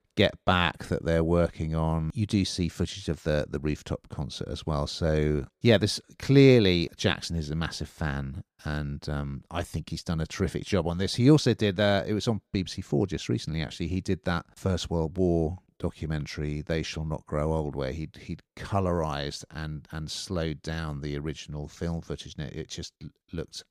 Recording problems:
none

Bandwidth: 14.5 kHz